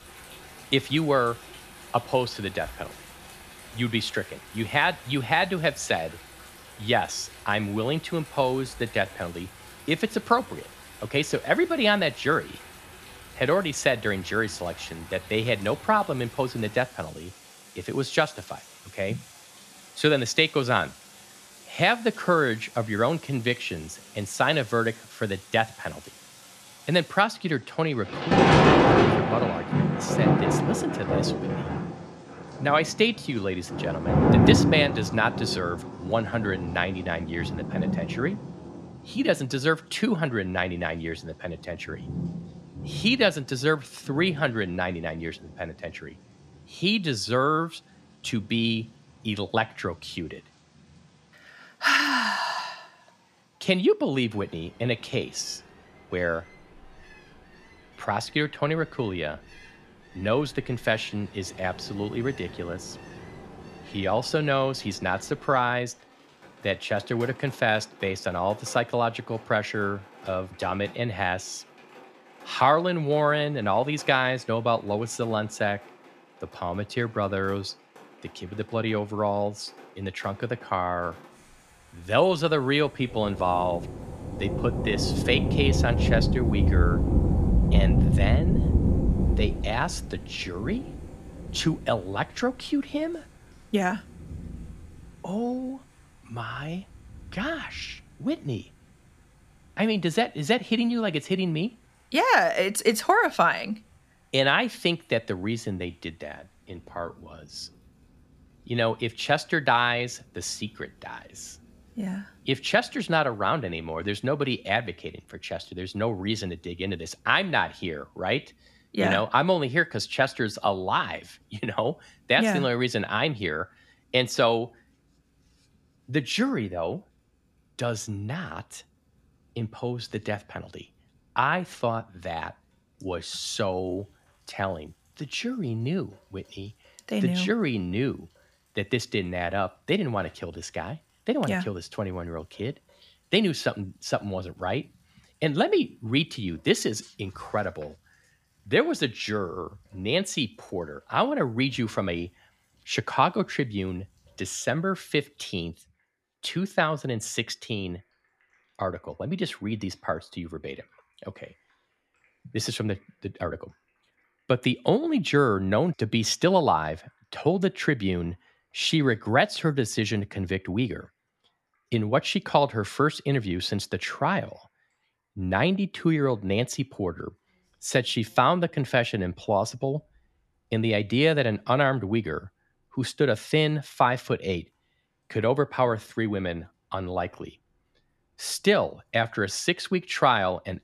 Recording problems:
rain or running water; loud; throughout; 1 dB below the speech

